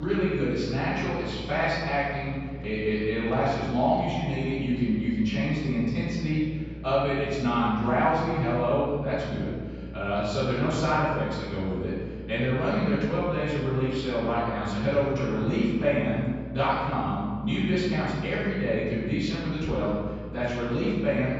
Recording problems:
room echo; strong; dies away in 1.5 s
off-mic speech; far
high frequencies cut off; noticeable; nothing above 8 kHz
electrical hum; faint; throughout; 60 Hz, 20 dB below the speech
animal sounds; very faint; until 7.5 s; 30 dB below the speech
abrupt cut into speech; at the start

